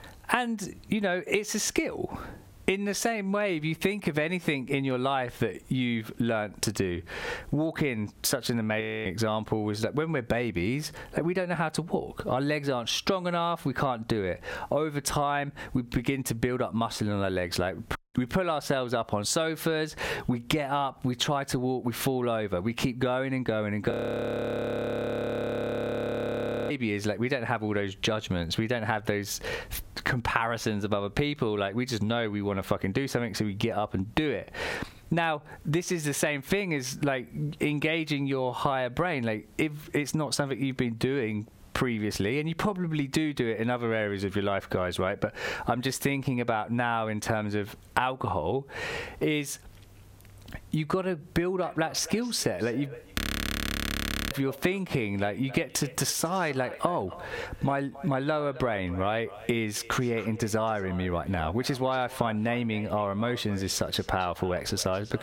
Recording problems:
squashed, flat; heavily
echo of what is said; noticeable; from 51 s on; 270 ms later, 20 dB below the speech
audio freezing; at 9 s, at 24 s for 3 s and at 53 s for 1 s

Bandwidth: 16.5 kHz